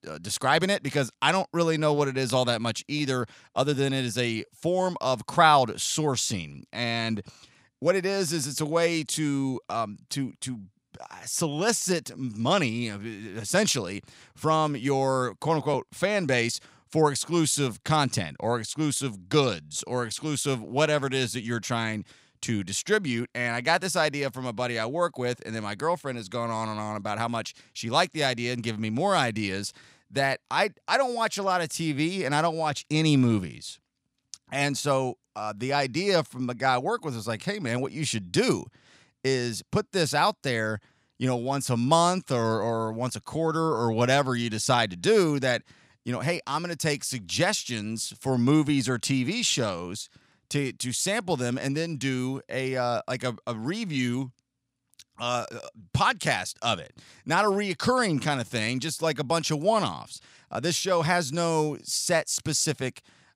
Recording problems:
none

